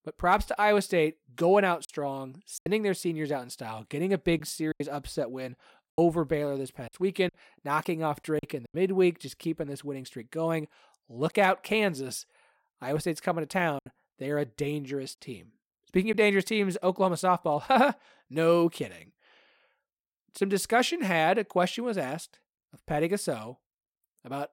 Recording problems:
choppy; occasionally; 3% of the speech affected

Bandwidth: 16 kHz